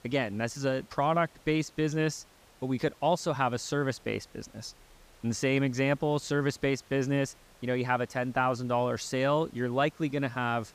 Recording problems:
hiss; faint; throughout; 30 dB below the speech

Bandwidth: 15 kHz